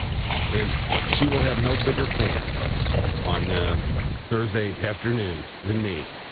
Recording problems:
high frequencies cut off; severe; nothing above 4 kHz
garbled, watery; slightly
hiss; loud; throughout; 4 dB below the speech
wind noise on the microphone; occasional gusts; until 4 s; 10 dB below the speech

